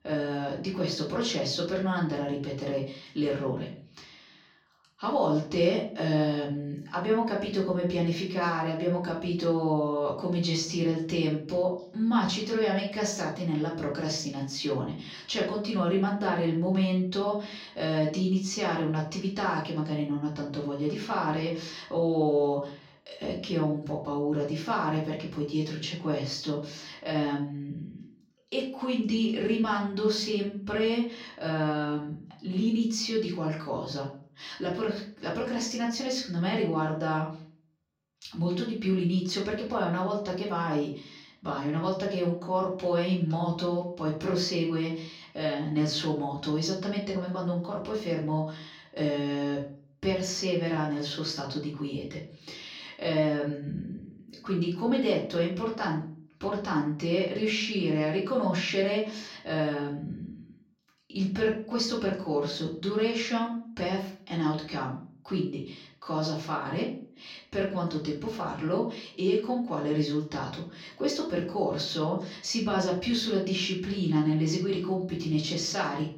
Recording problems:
off-mic speech; far
room echo; slight; dies away in 0.4 s

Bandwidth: 16 kHz